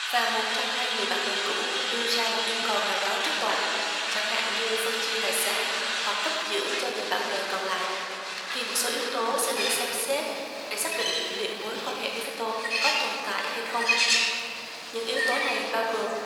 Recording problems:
thin; very; fading below 850 Hz
room echo; noticeable; dies away in 2.6 s
off-mic speech; somewhat distant
animal sounds; loud; throughout; 1 dB below the speech
crowd noise; loud; throughout; as loud as the speech
uneven, jittery; strongly; from 2.5 to 13 s

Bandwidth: 17 kHz